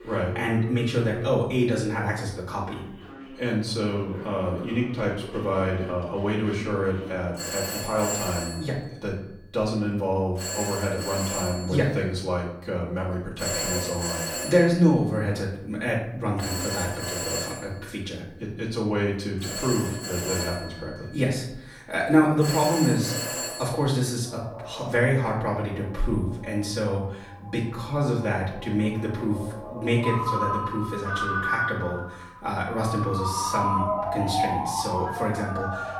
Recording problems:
off-mic speech; far
room echo; noticeable; dies away in 0.6 s
alarms or sirens; loud; throughout; 4 dB below the speech

